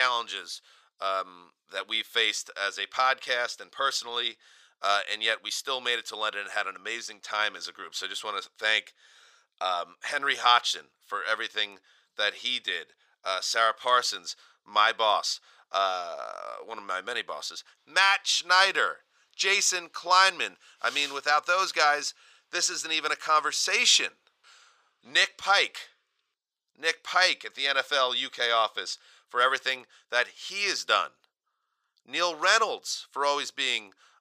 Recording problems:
thin; very; fading below 650 Hz
abrupt cut into speech; at the start

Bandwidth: 15 kHz